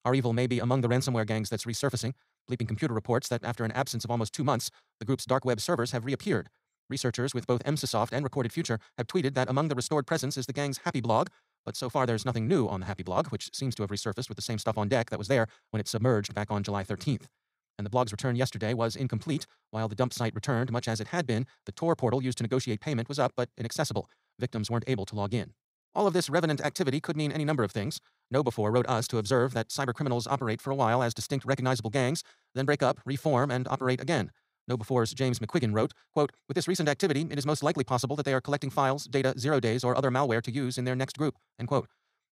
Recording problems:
wrong speed, natural pitch; too fast; 1.6 times normal speed

